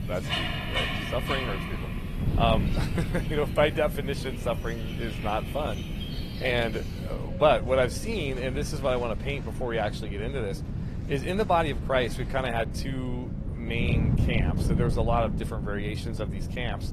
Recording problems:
garbled, watery; slightly; nothing above 14 kHz
animal sounds; loud; throughout; 8 dB below the speech
wind noise on the microphone; occasional gusts; 15 dB below the speech

